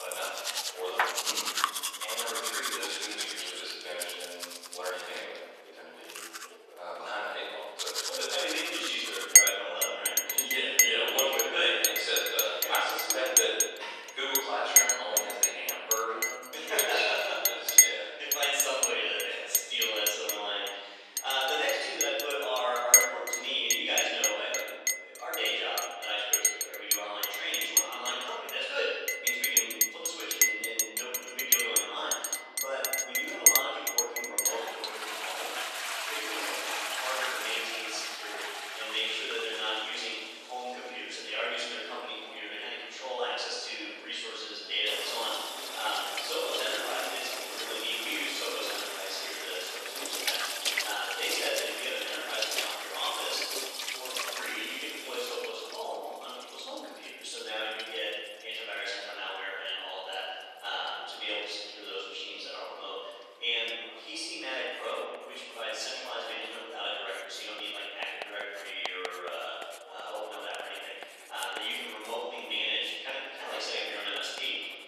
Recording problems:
room echo; strong; dies away in 1.4 s
off-mic speech; far
thin; very; fading below 450 Hz
household noises; very loud; throughout; 4 dB above the speech
background chatter; faint; throughout; 2 voices, 25 dB below the speech
abrupt cut into speech; at the start

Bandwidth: 13.5 kHz